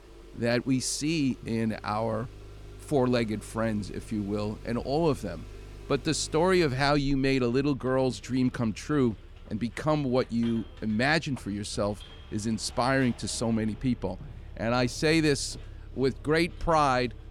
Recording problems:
traffic noise; noticeable; throughout; 20 dB below the speech

